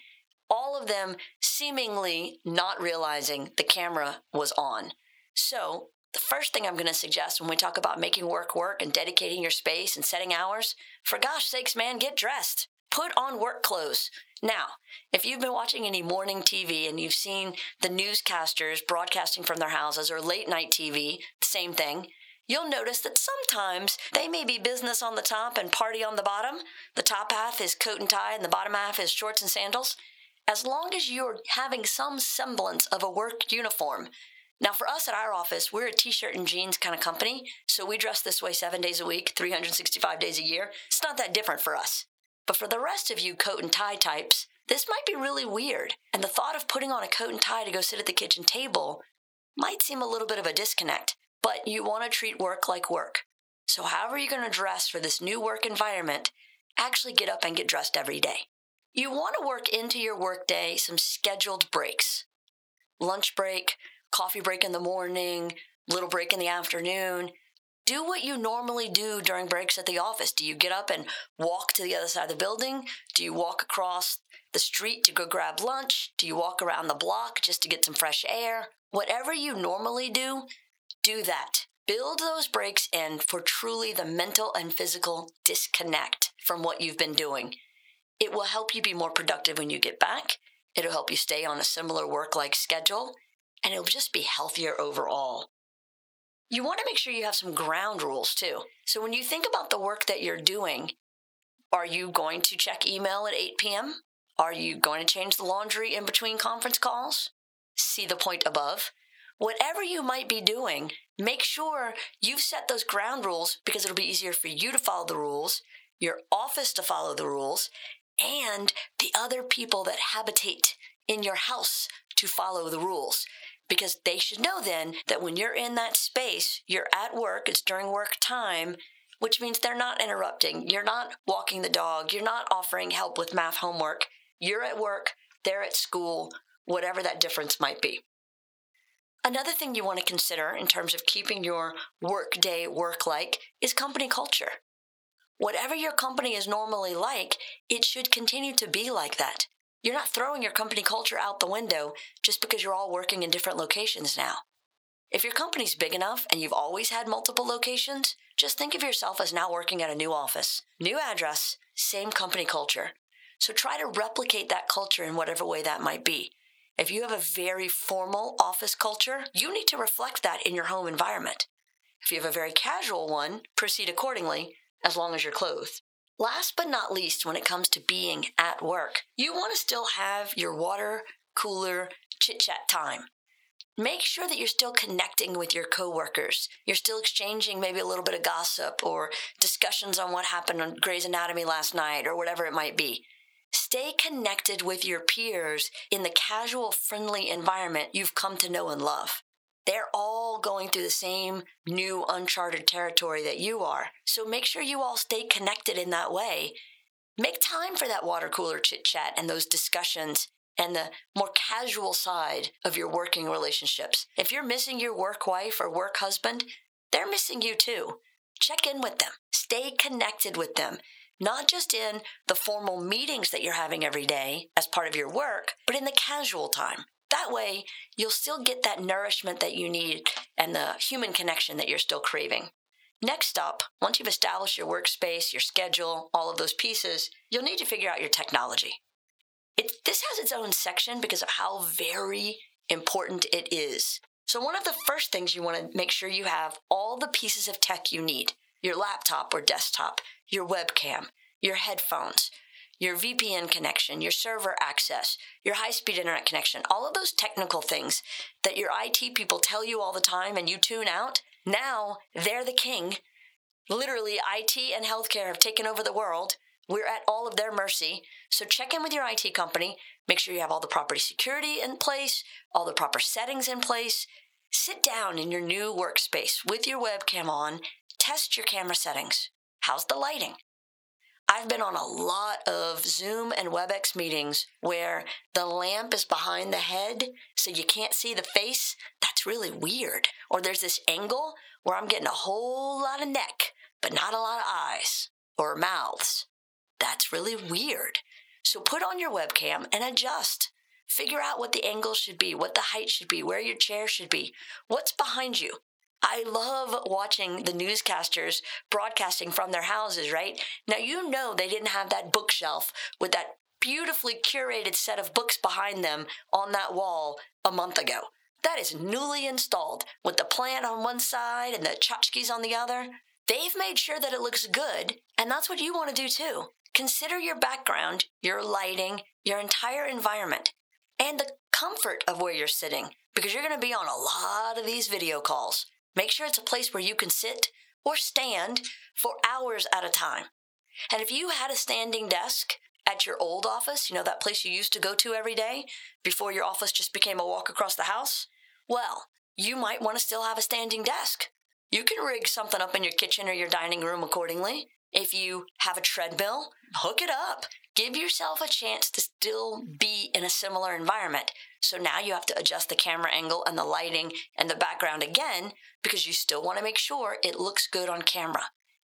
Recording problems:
thin; somewhat; fading below 850 Hz
squashed, flat; somewhat

